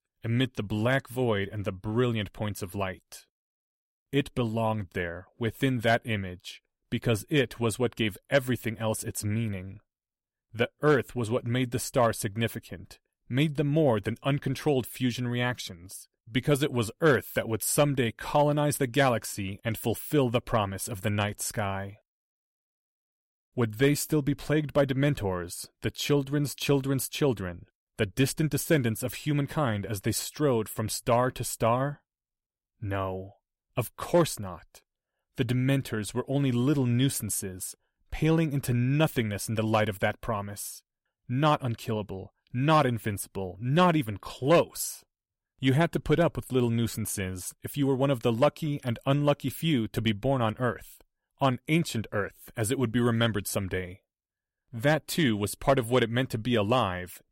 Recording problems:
none

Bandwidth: 16 kHz